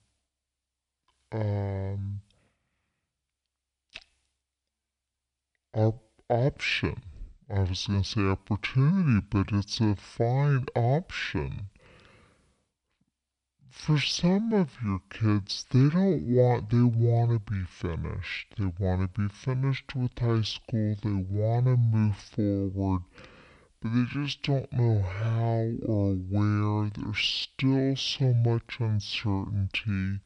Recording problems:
wrong speed and pitch; too slow and too low; 0.5 times normal speed

